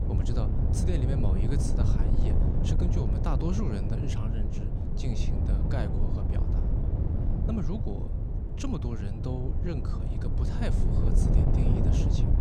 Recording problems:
wind noise on the microphone; heavy; 1 dB above the speech

